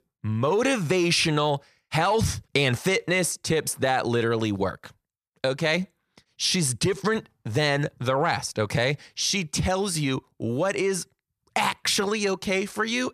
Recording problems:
none

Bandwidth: 14 kHz